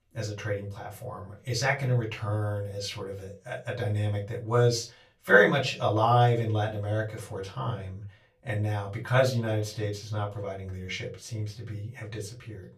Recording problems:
off-mic speech; far
room echo; very slight; dies away in 0.2 s

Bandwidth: 14.5 kHz